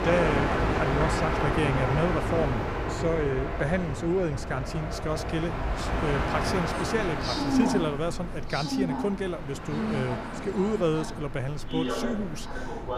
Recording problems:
train or aircraft noise; very loud; throughout; as loud as the speech

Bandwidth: 15 kHz